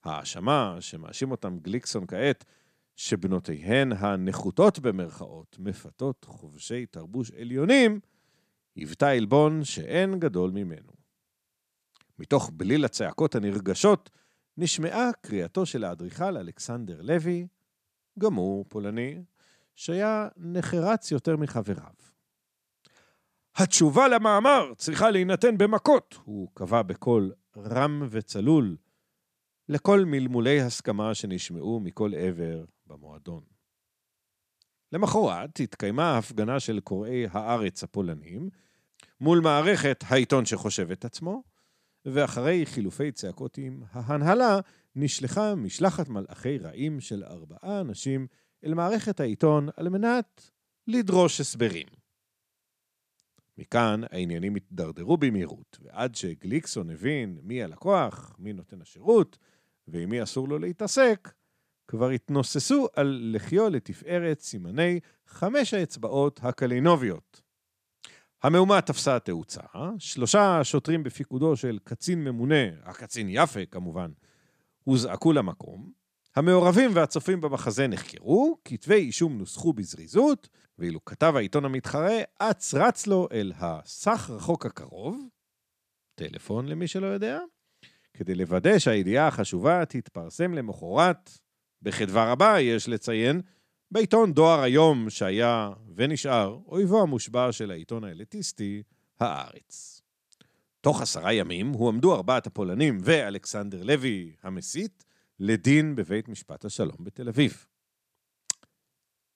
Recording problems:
none

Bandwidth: 14.5 kHz